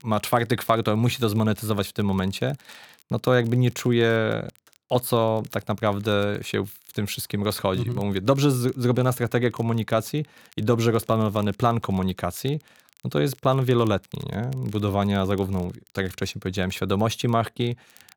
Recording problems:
crackle, like an old record; faint; 30 dB below the speech

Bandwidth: 19 kHz